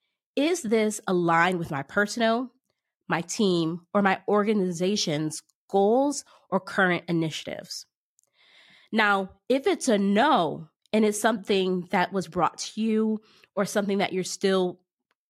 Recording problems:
none

